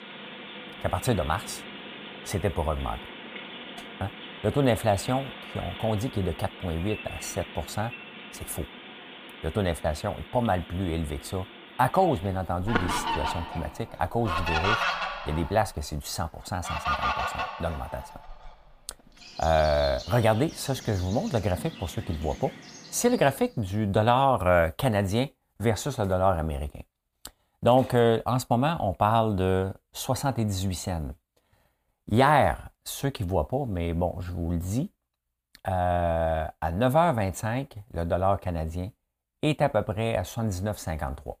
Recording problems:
animal sounds; loud; until 23 s; 8 dB below the speech

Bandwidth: 15 kHz